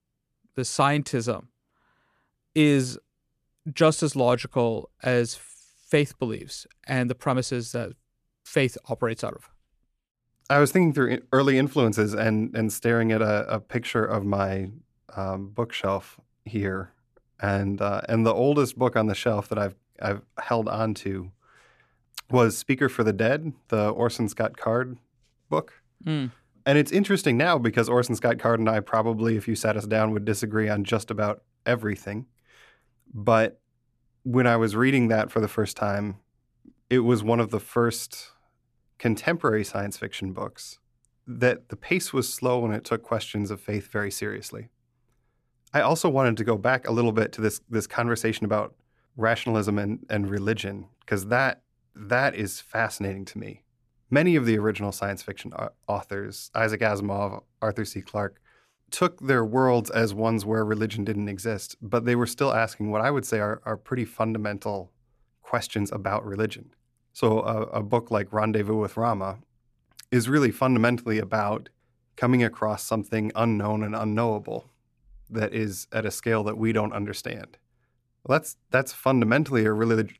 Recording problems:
none

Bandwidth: 14 kHz